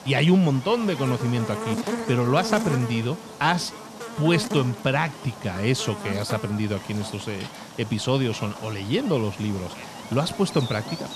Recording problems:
electrical hum; loud; throughout; 50 Hz, 8 dB below the speech

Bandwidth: 13.5 kHz